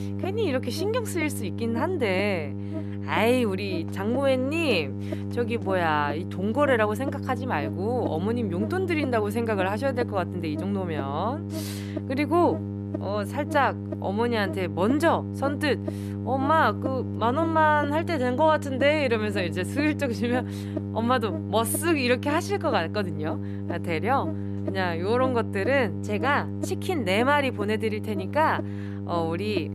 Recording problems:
electrical hum; noticeable; throughout; 50 Hz, 10 dB below the speech

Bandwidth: 13.5 kHz